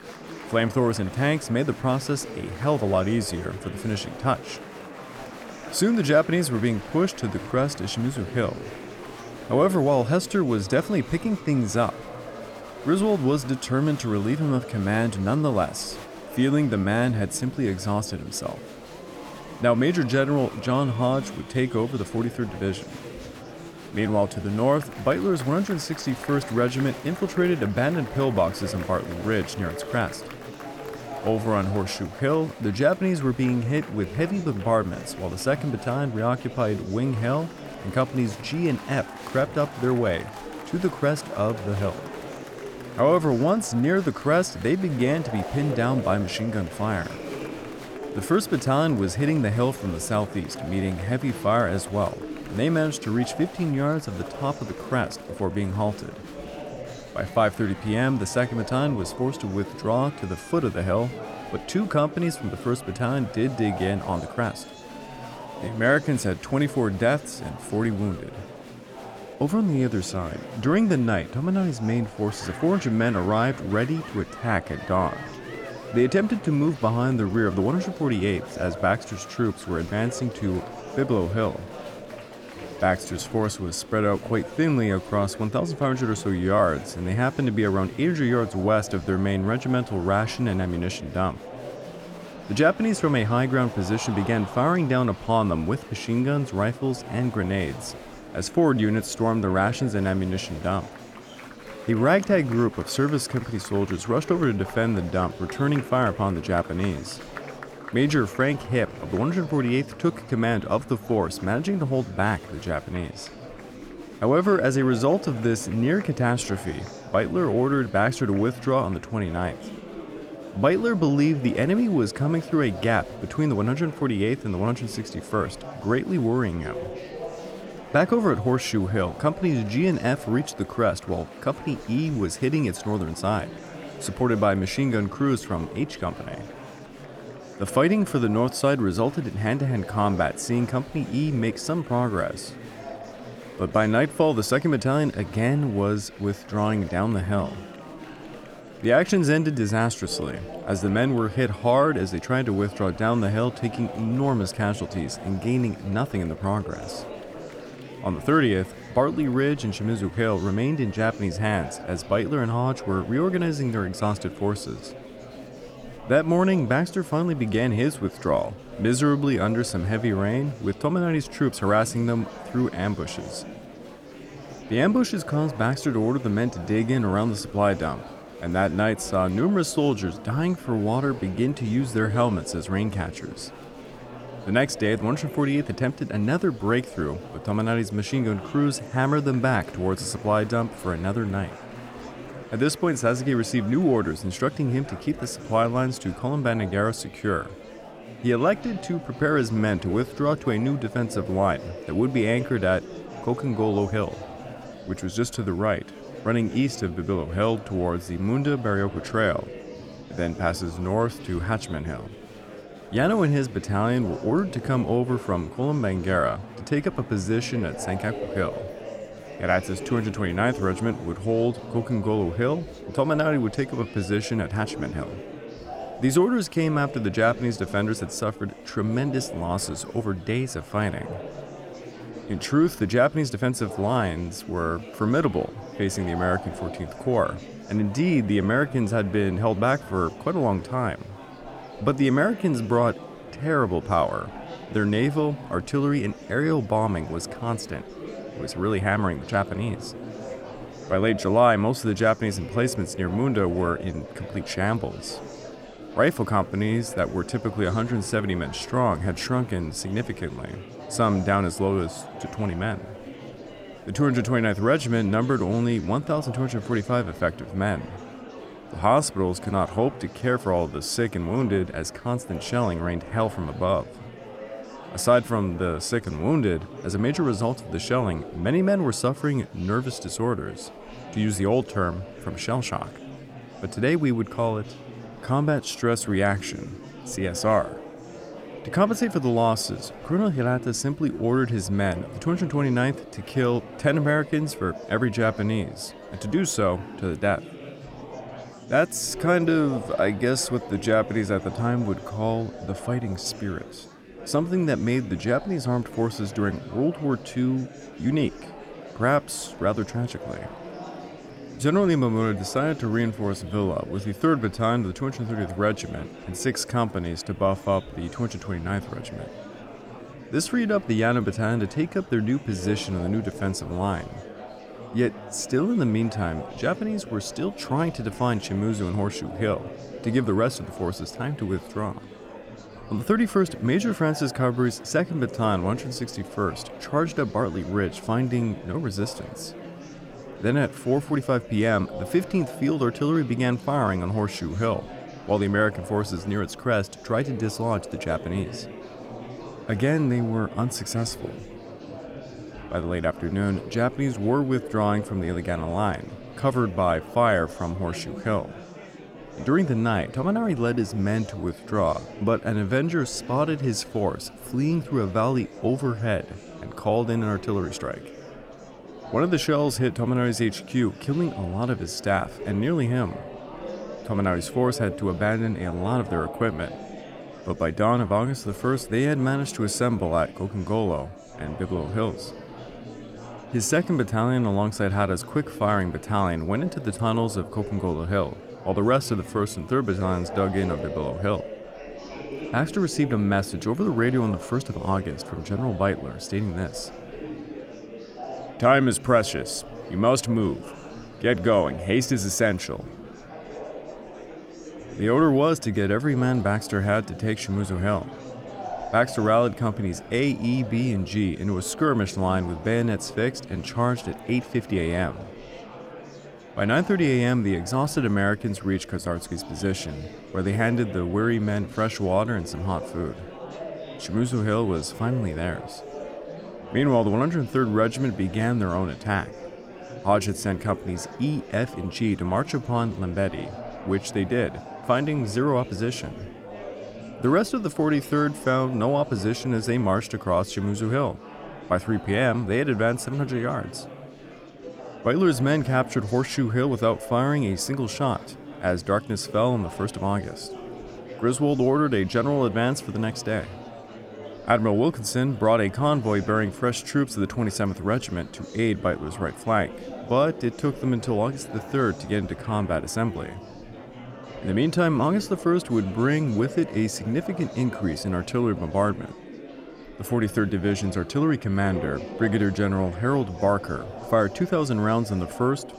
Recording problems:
murmuring crowd; noticeable; throughout; 15 dB below the speech

